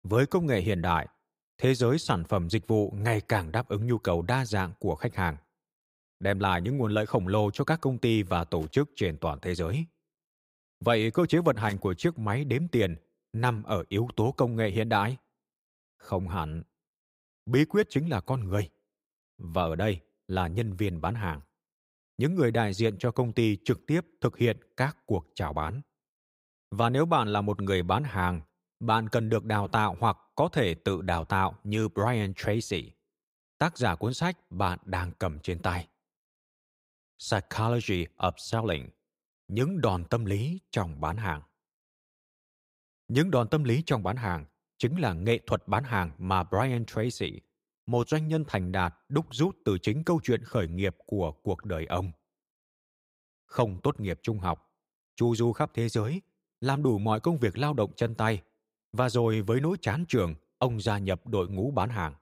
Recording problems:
none

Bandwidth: 15.5 kHz